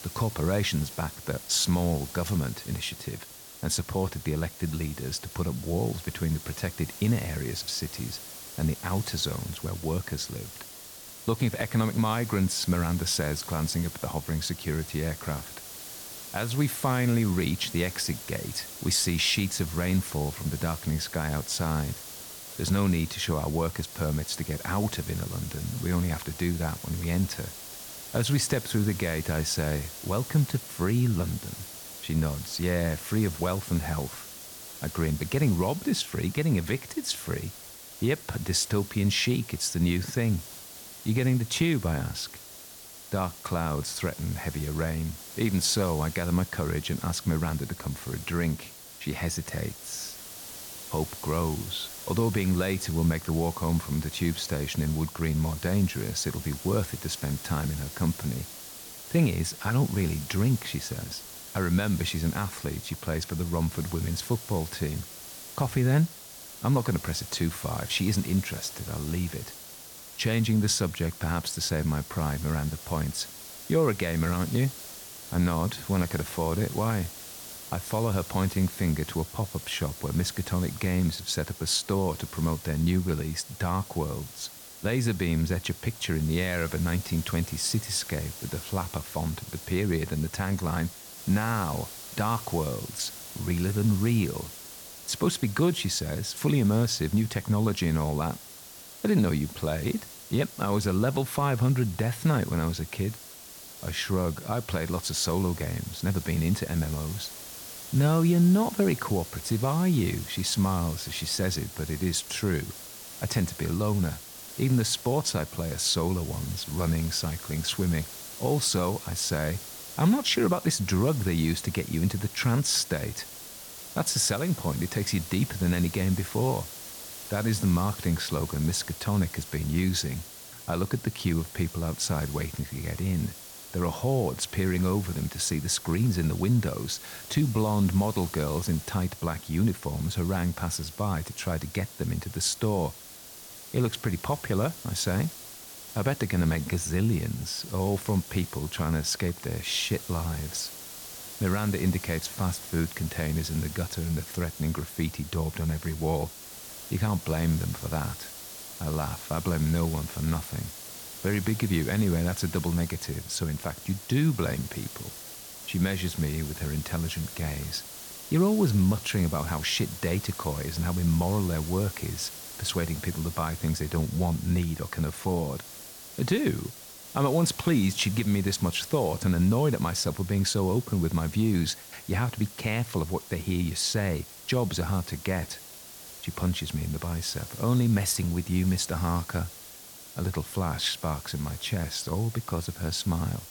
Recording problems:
hiss; noticeable; throughout; 10 dB below the speech

